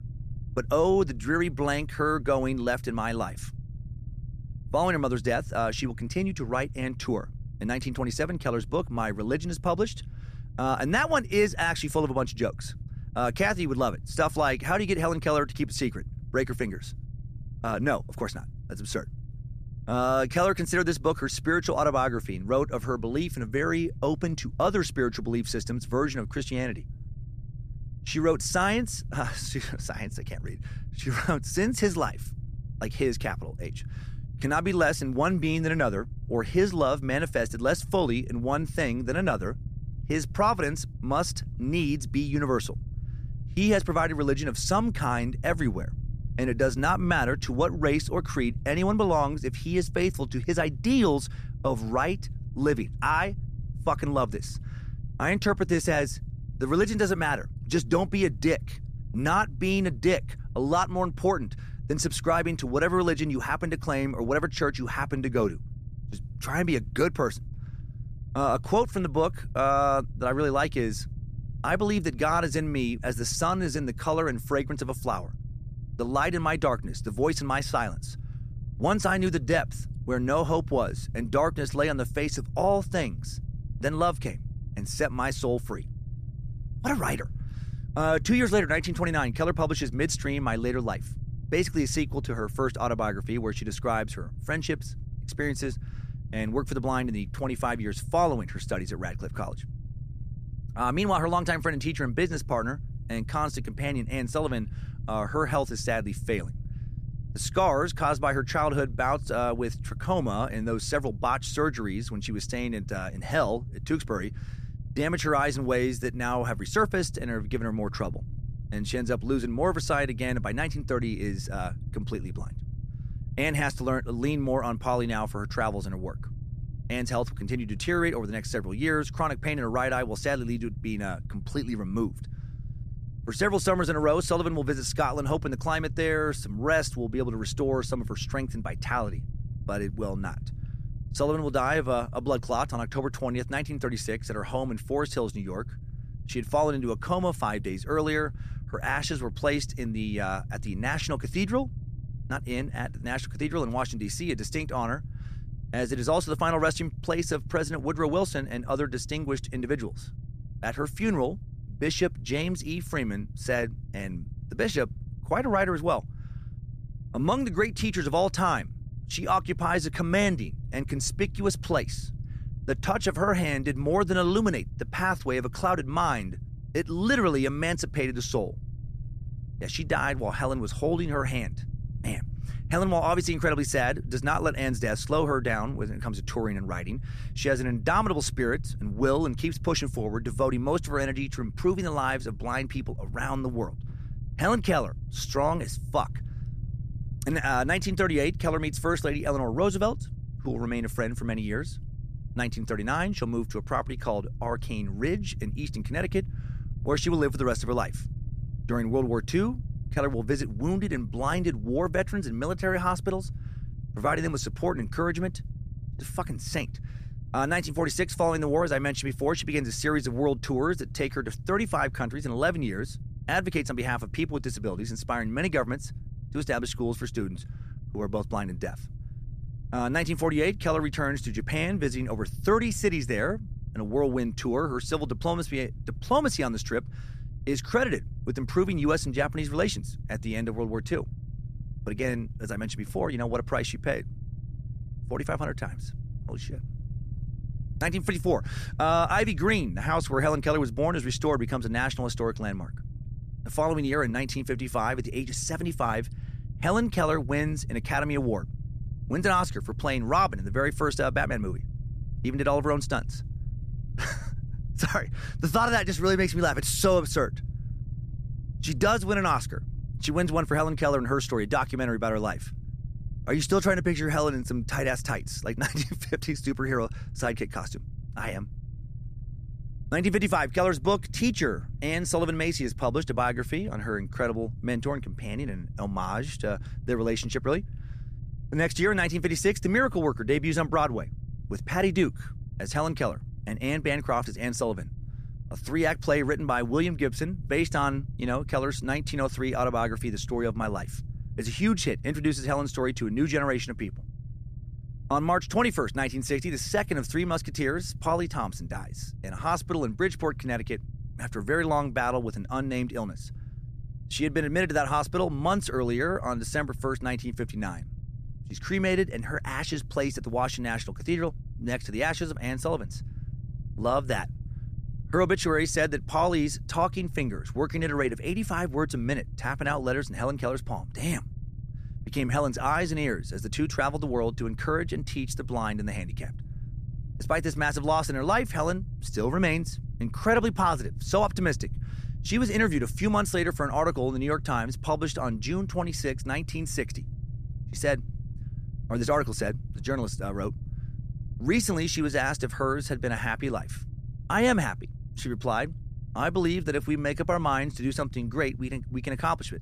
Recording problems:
low rumble; faint; throughout; 25 dB below the speech

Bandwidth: 14.5 kHz